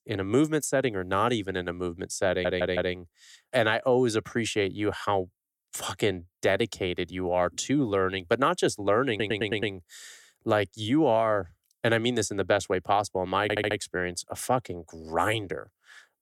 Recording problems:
audio stuttering; at 2.5 s, at 9 s and at 13 s

